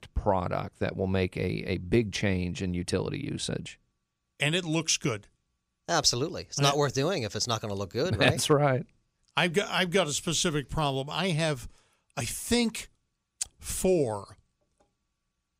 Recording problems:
none

